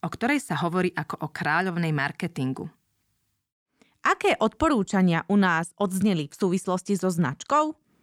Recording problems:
none

